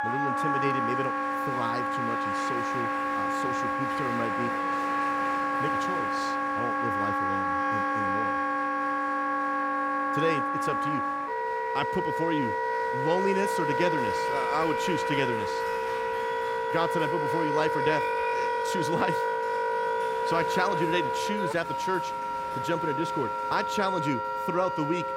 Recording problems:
background music; very loud; throughout; 4 dB above the speech
crowd noise; loud; throughout; 10 dB below the speech

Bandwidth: 16 kHz